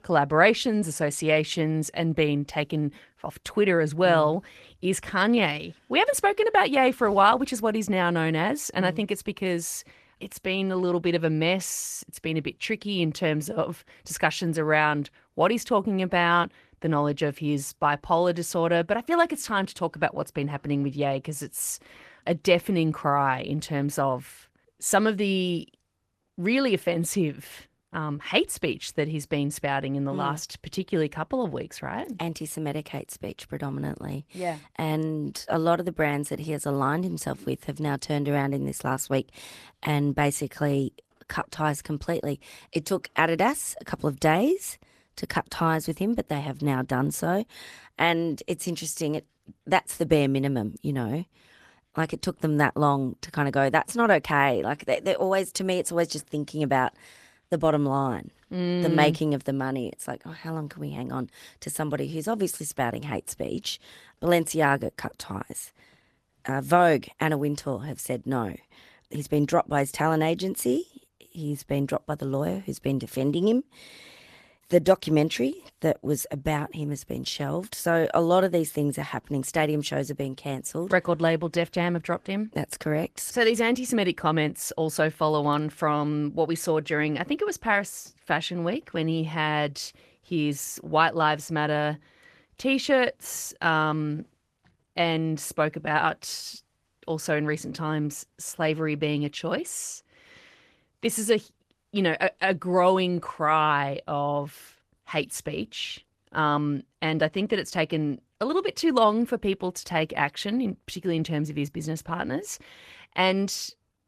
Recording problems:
garbled, watery; slightly; nothing above 14 kHz

